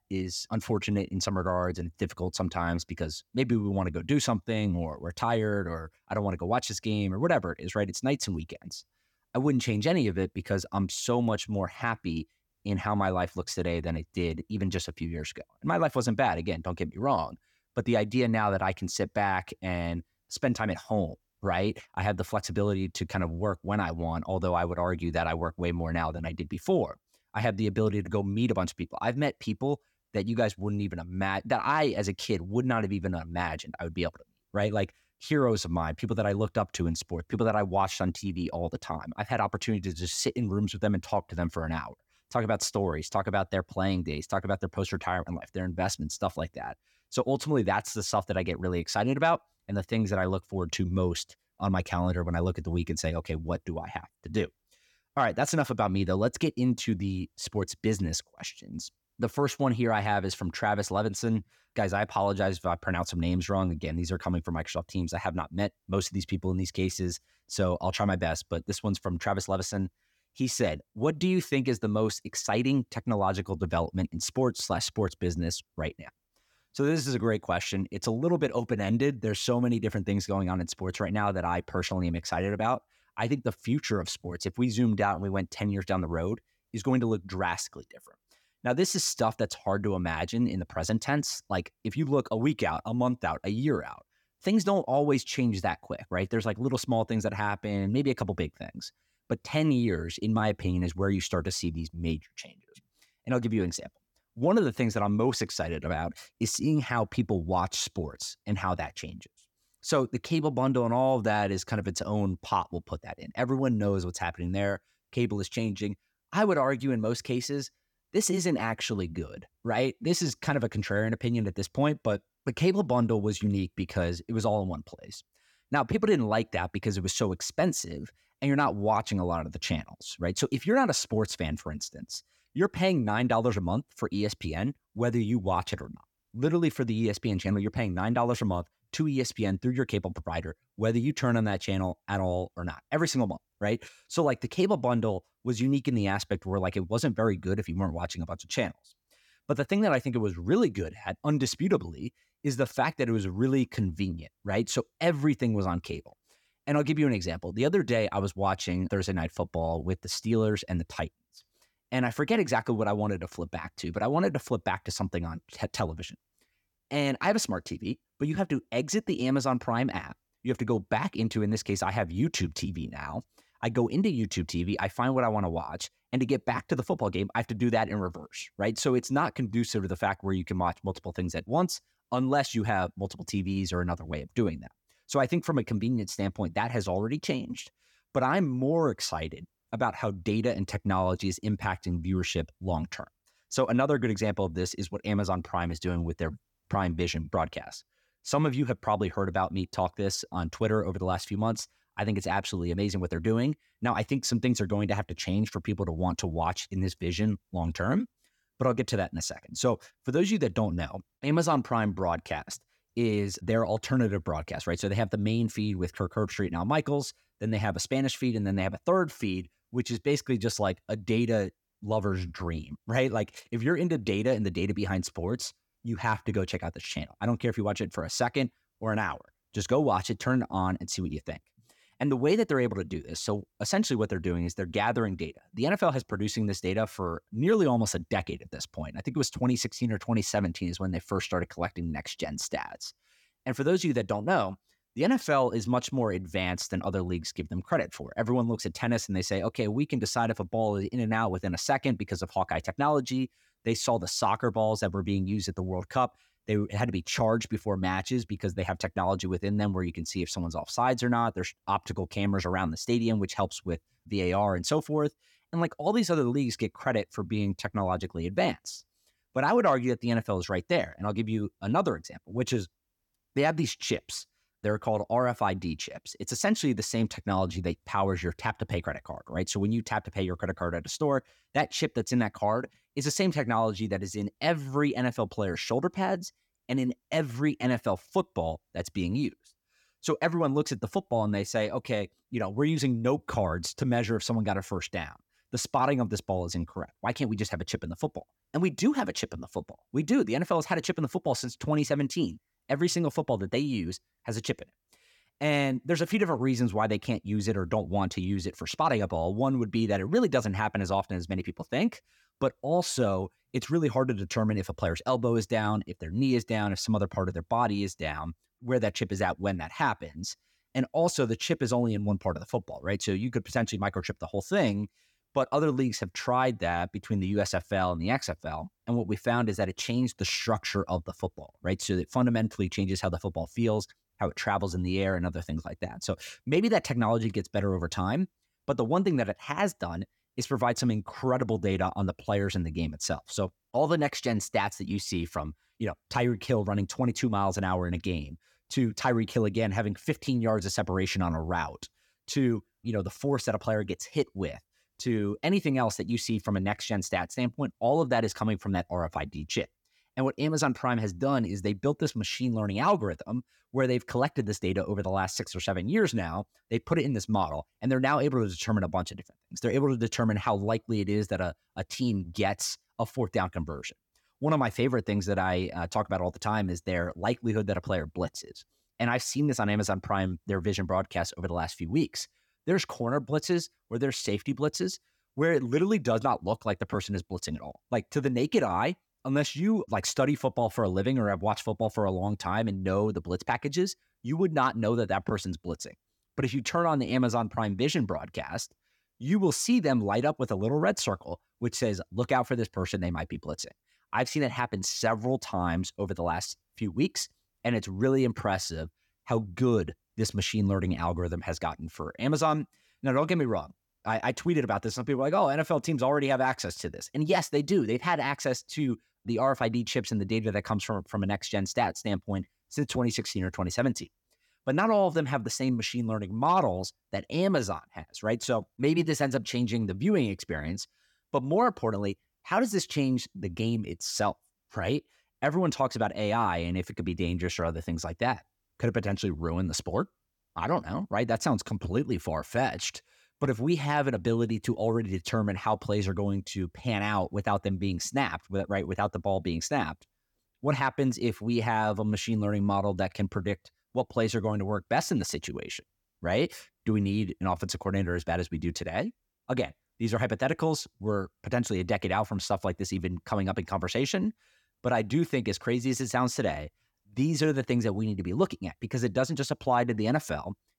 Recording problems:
none

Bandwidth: 18 kHz